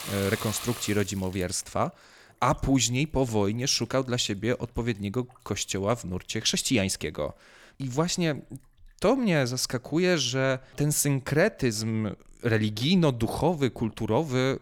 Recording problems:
household noises; noticeable; throughout; 15 dB below the speech

